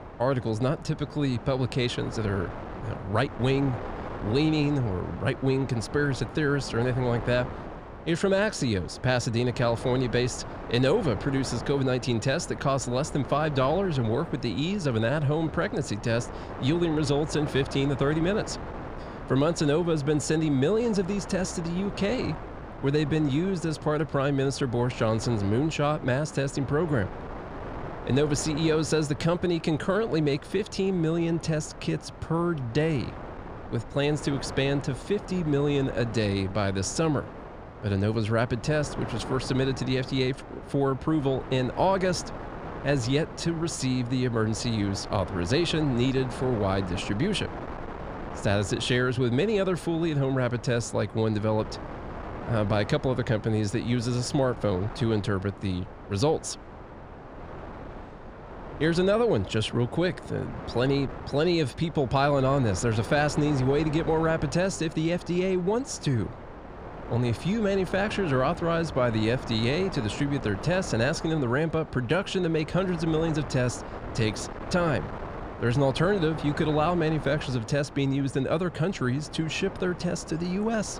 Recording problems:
wind noise on the microphone; occasional gusts; 10 dB below the speech

